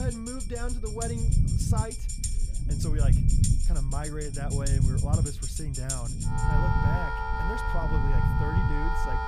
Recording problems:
background music; very loud; throughout; 2 dB above the speech
low rumble; loud; throughout; 3 dB below the speech
high-pitched whine; faint; throughout; 2.5 kHz, 25 dB below the speech
abrupt cut into speech; at the start

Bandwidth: 15 kHz